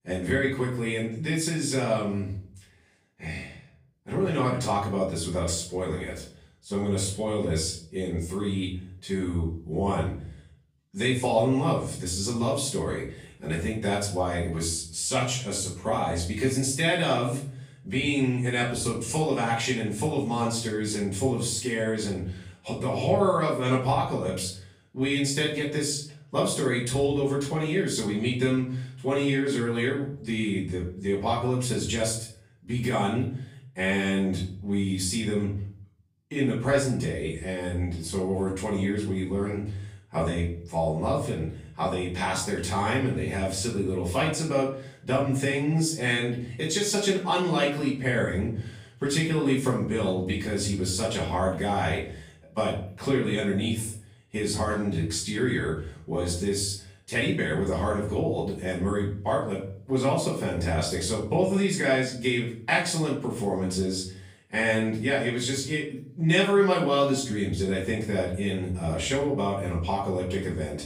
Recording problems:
off-mic speech; far
room echo; noticeable; dies away in 0.5 s

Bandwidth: 15.5 kHz